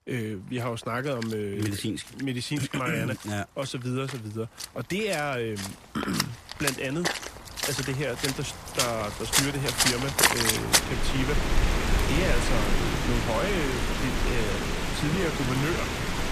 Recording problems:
rain or running water; very loud; throughout; 4 dB above the speech

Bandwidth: 14.5 kHz